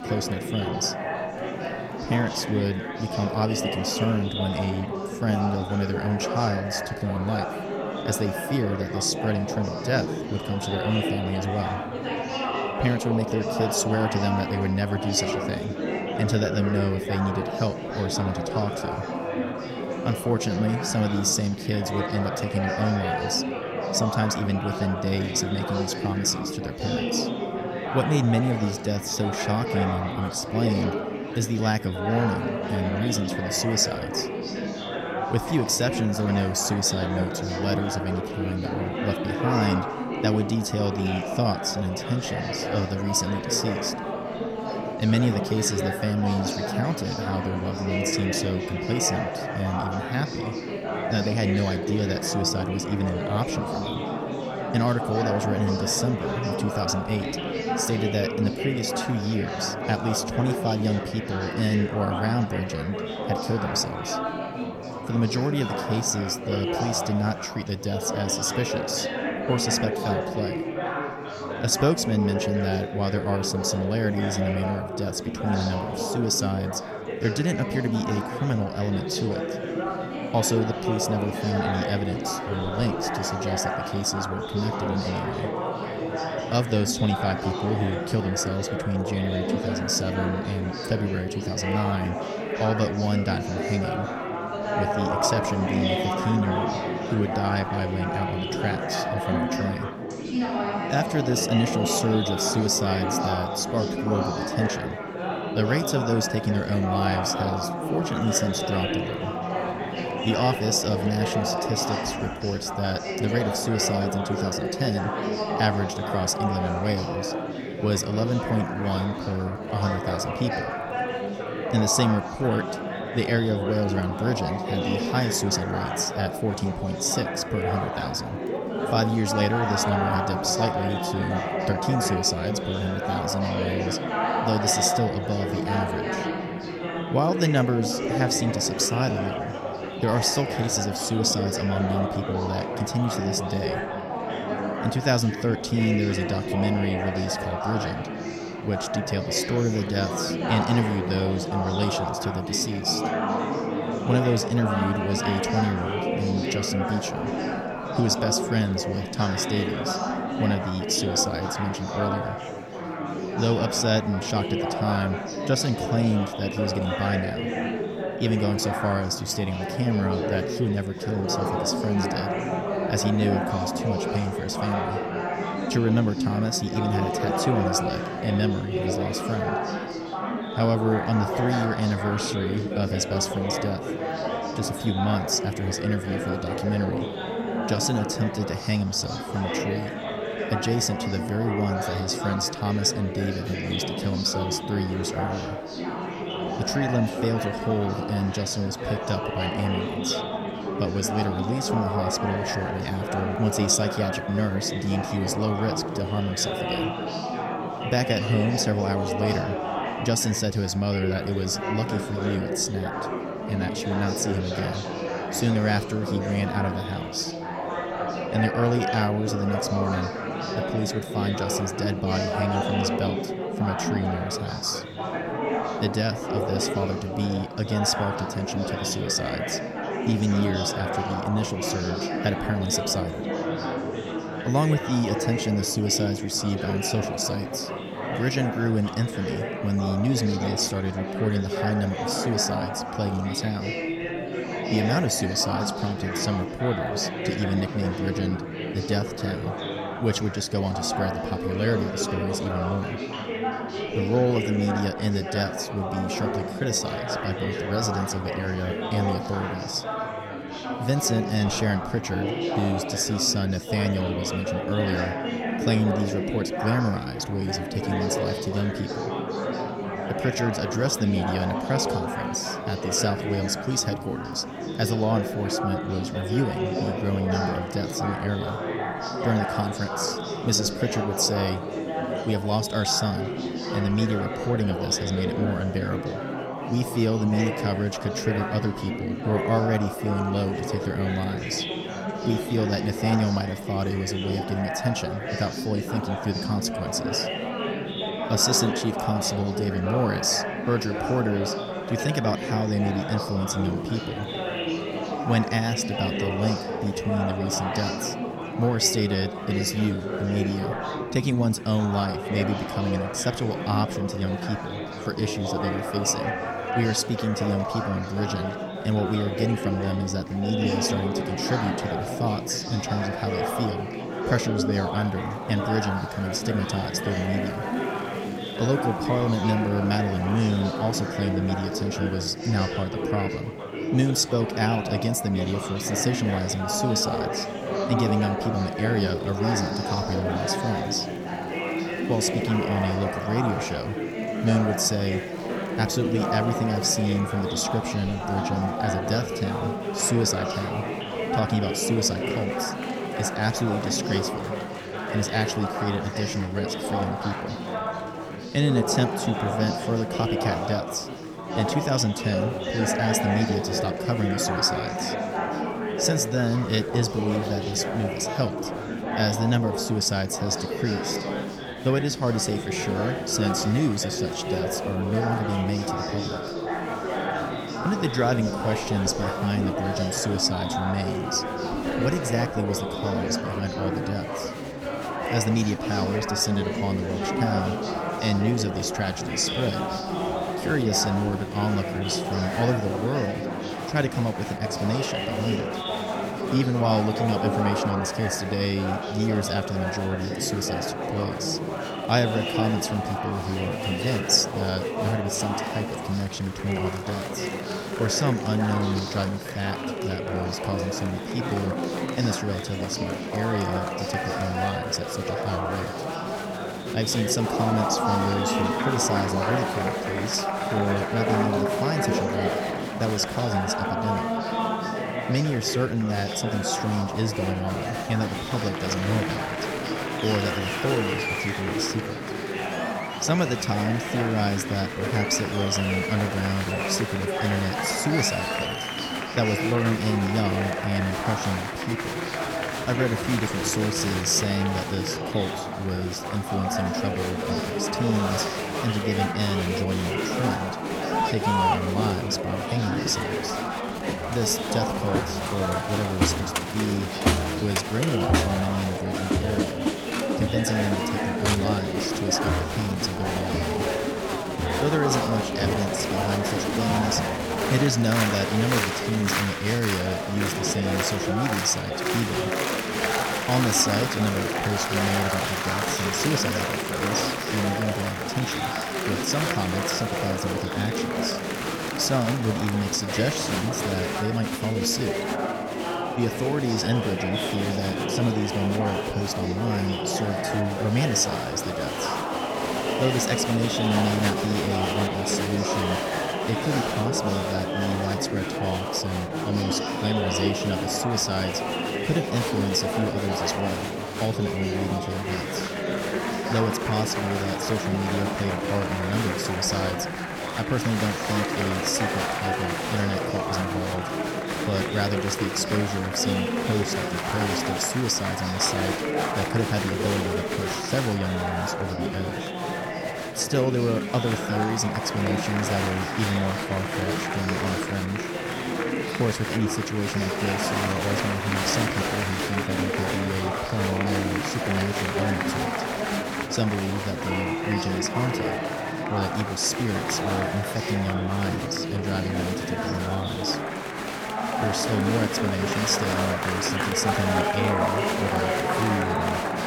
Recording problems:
murmuring crowd; loud; throughout; 2 dB below the speech

